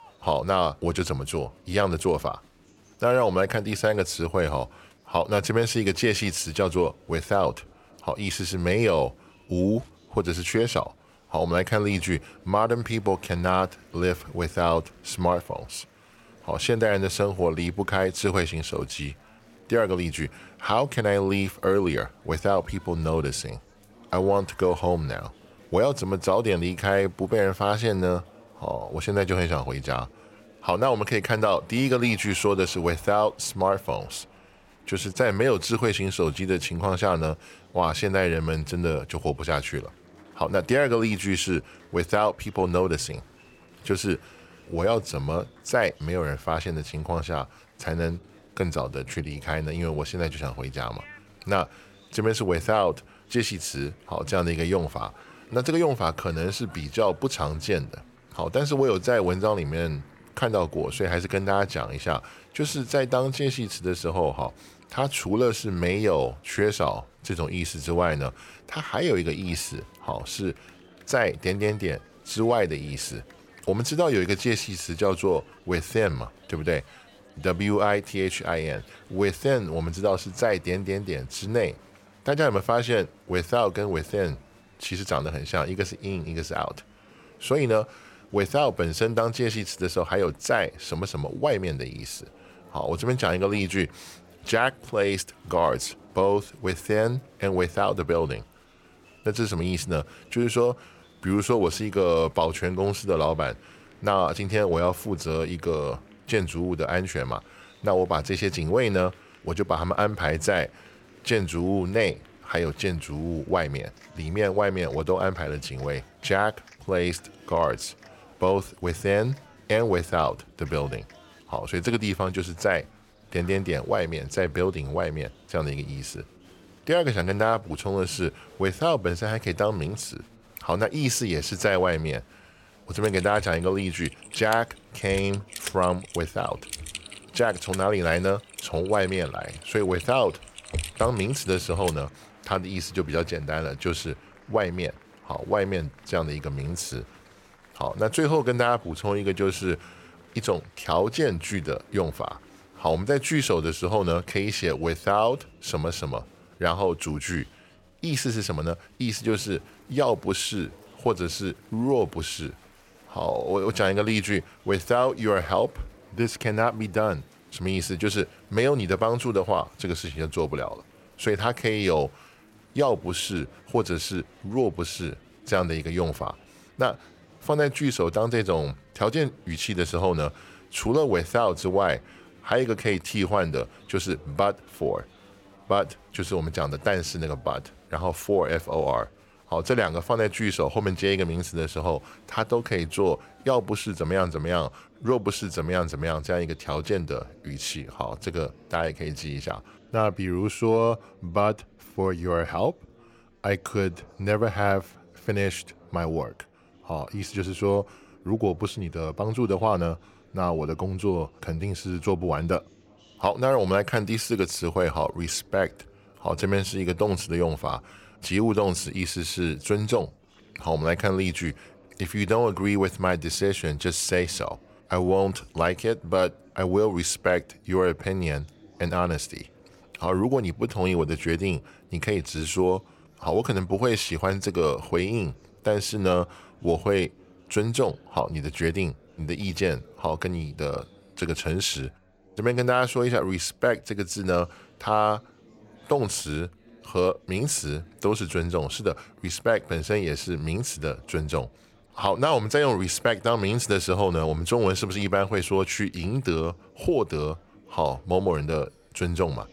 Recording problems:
murmuring crowd; faint; throughout; 25 dB below the speech
keyboard typing; noticeable; from 2:13 to 2:22; peak 5 dB below the speech

